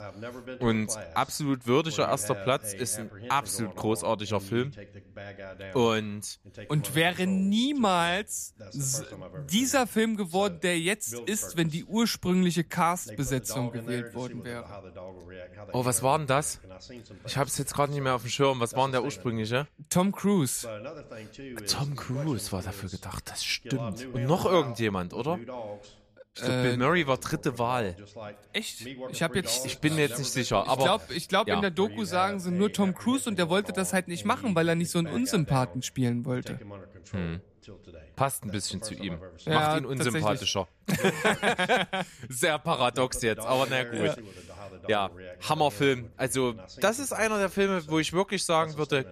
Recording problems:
voice in the background; noticeable; throughout; 15 dB below the speech

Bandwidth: 14.5 kHz